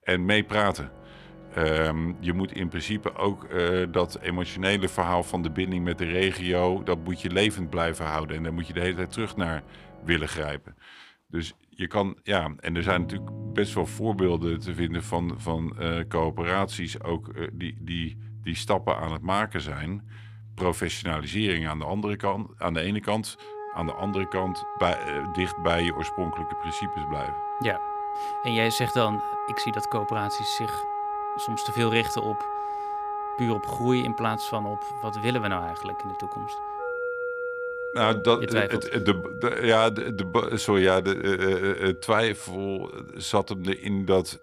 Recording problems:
background music; loud; throughout; 7 dB below the speech

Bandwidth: 15 kHz